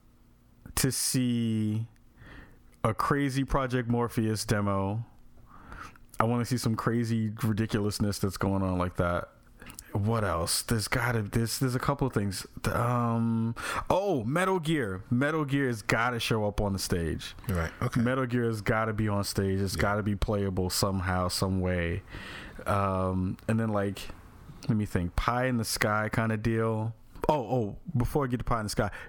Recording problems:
squashed, flat; heavily

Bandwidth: 18 kHz